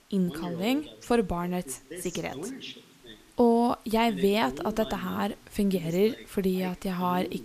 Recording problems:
voice in the background; noticeable; throughout; 15 dB below the speech
hiss; faint; throughout; 30 dB below the speech

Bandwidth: 14.5 kHz